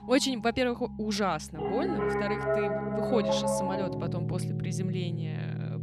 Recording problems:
background music; very loud; throughout; 1 dB above the speech

